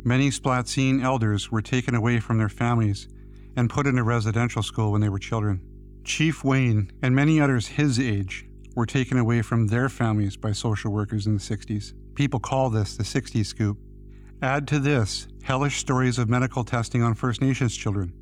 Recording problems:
electrical hum; faint; throughout; 50 Hz, 30 dB below the speech

